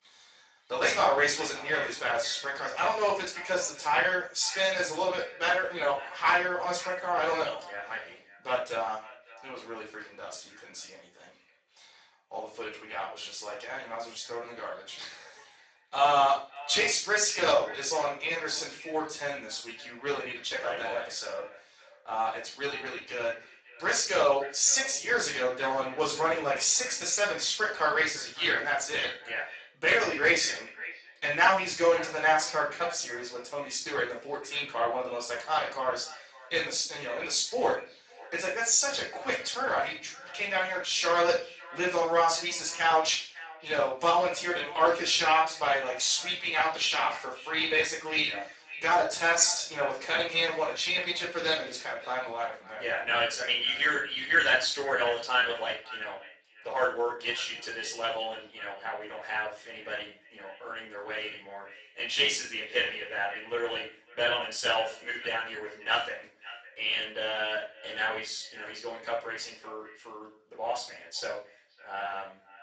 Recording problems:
off-mic speech; far
garbled, watery; badly; nothing above 7.5 kHz
thin; very; fading below 750 Hz
echo of what is said; noticeable; throughout; 550 ms later, 20 dB below the speech
room echo; slight; dies away in 0.4 s

